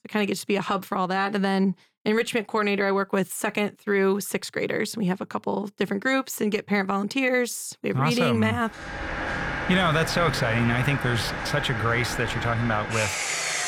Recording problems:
machinery noise; loud; from 9 s on; 4 dB below the speech

